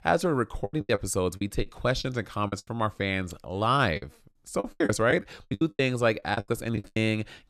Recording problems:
choppy; very; 15% of the speech affected

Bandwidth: 13.5 kHz